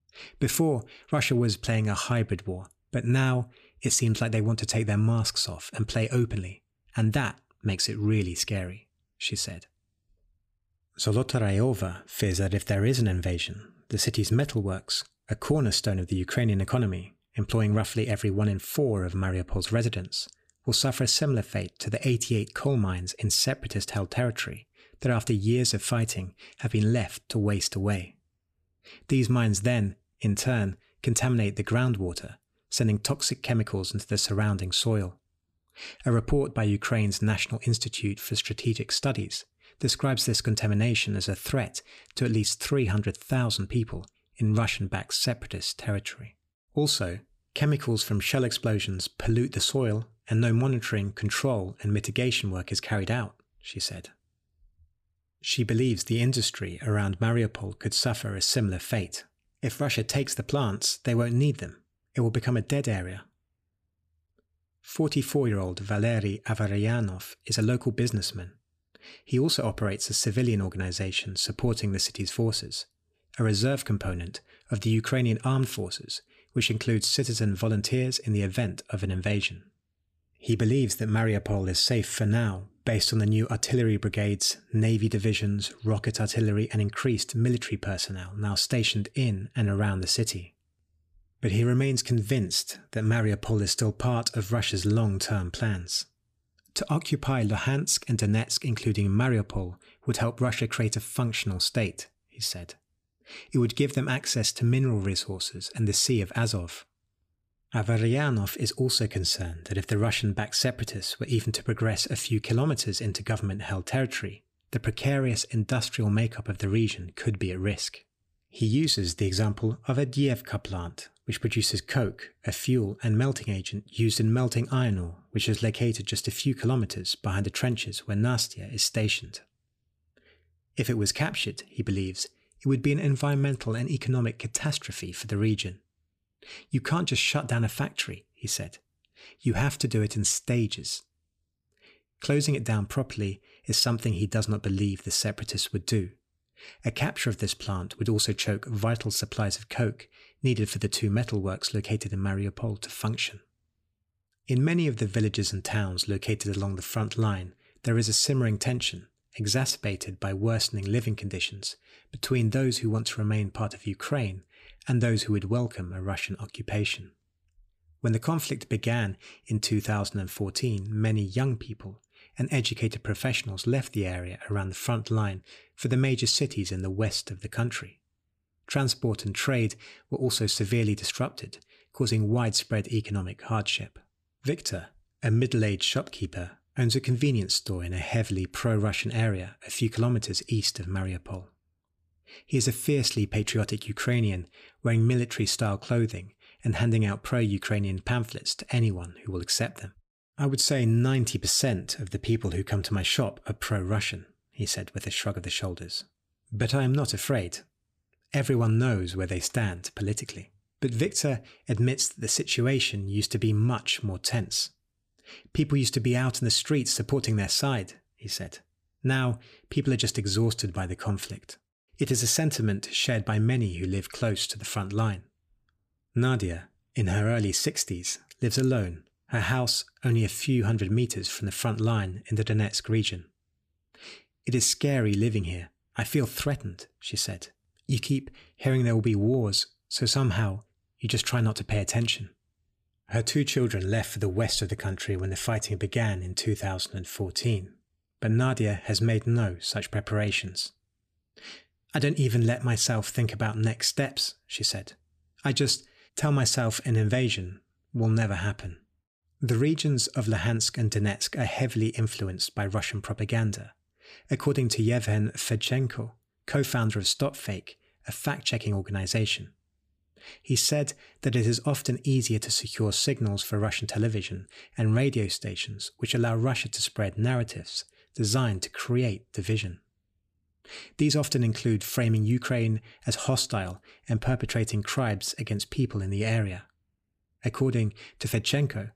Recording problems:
none

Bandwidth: 15 kHz